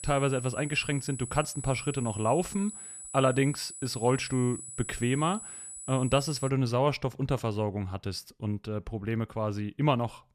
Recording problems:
high-pitched whine; noticeable; until 6.5 s; 8 kHz, 10 dB below the speech

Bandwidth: 14 kHz